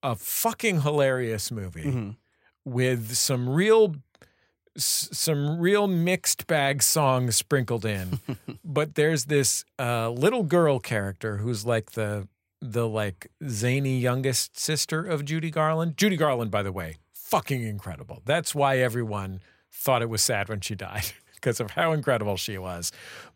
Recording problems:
none

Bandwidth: 16 kHz